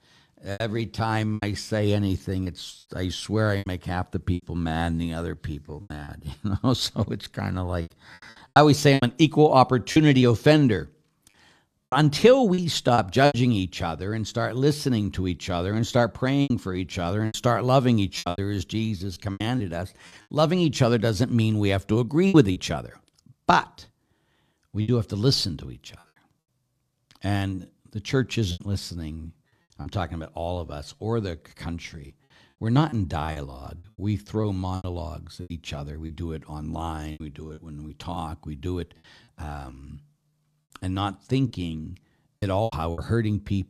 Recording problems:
choppy; very; 8% of the speech affected

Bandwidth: 14.5 kHz